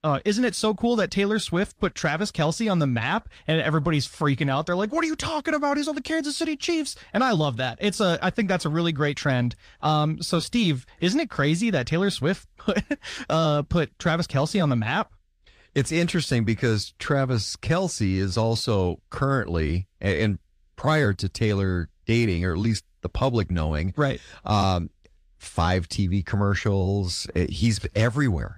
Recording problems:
none

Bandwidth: 15 kHz